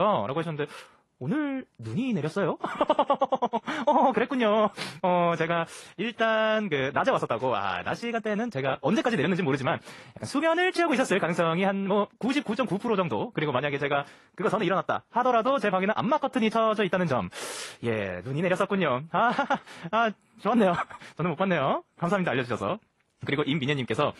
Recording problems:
wrong speed, natural pitch; too fast; 1.5 times normal speed
garbled, watery; slightly; nothing above 11.5 kHz
abrupt cut into speech; at the start

